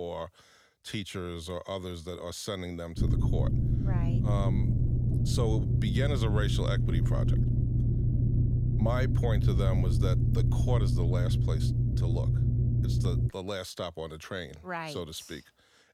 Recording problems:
low rumble; loud; from 3 to 13 s; 2 dB below the speech
abrupt cut into speech; at the start

